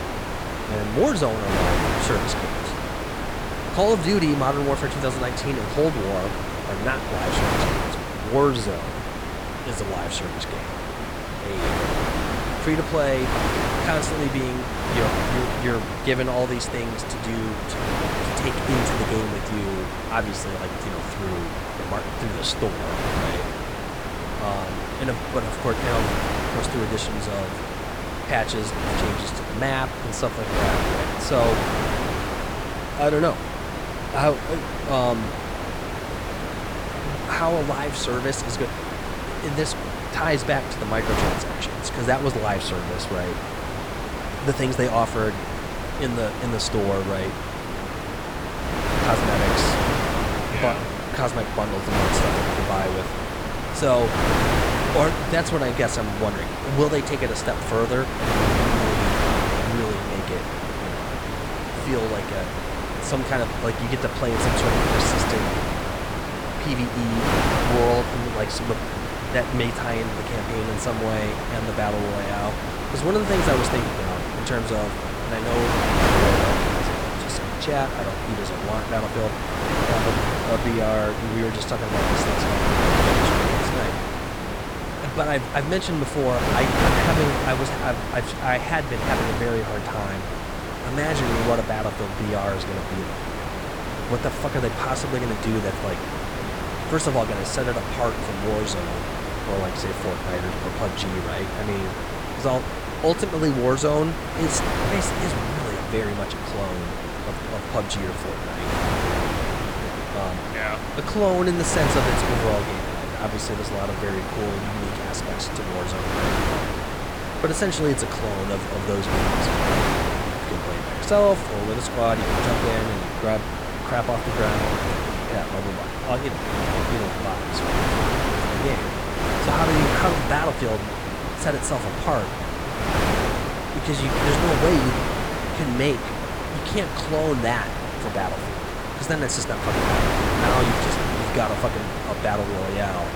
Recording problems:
wind noise on the microphone; heavy; as loud as the speech

